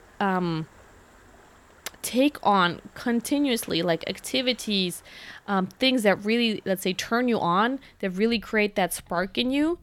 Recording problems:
rain or running water; faint; throughout; 30 dB below the speech

